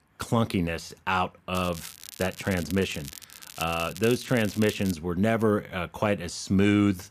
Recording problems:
crackling; noticeable; from 1.5 to 5 s; 15 dB below the speech

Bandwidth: 14.5 kHz